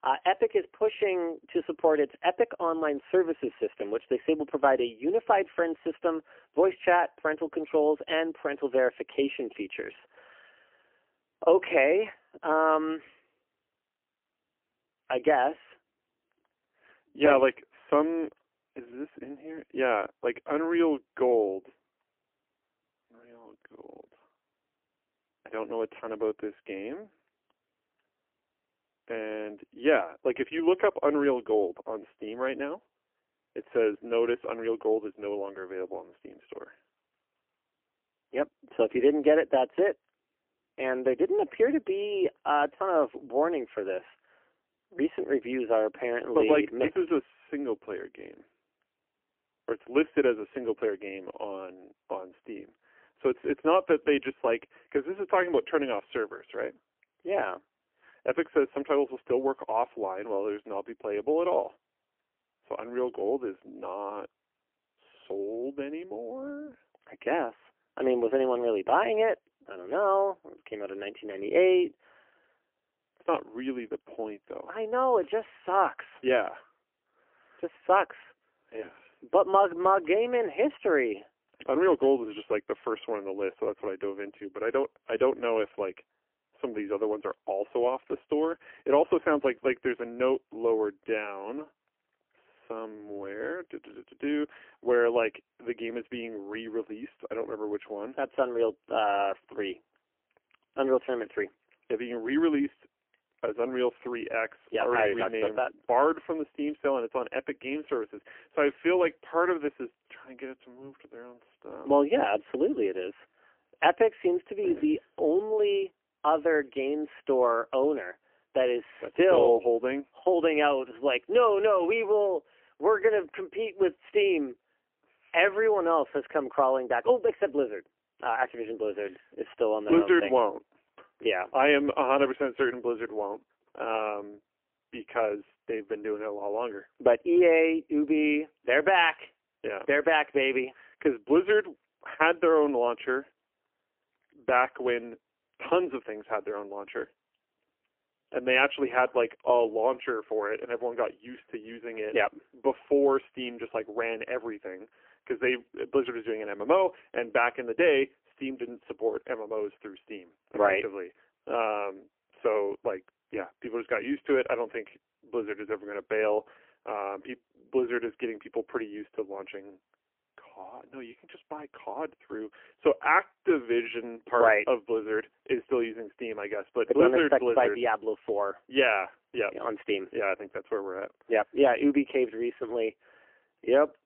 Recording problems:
phone-call audio; poor line; nothing above 3 kHz

